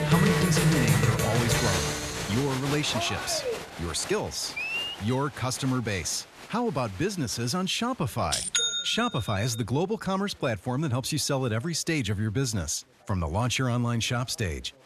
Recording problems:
crowd noise; very loud; throughout; as loud as the speech

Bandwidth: 13.5 kHz